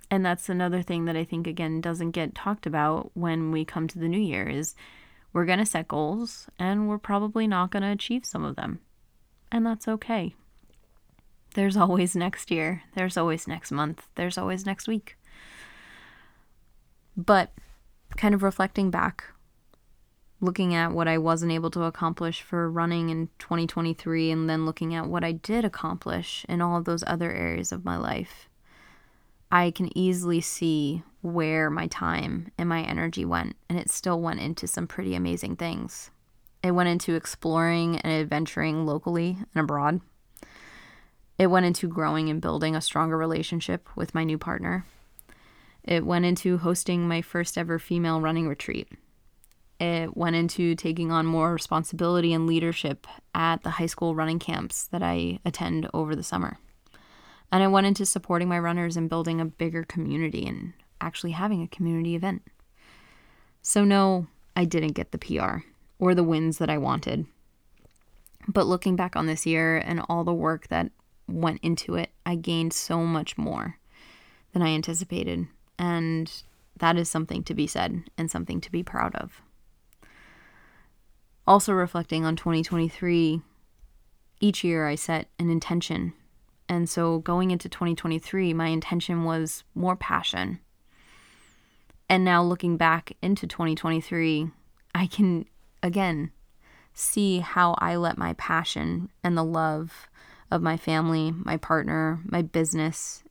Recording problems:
none

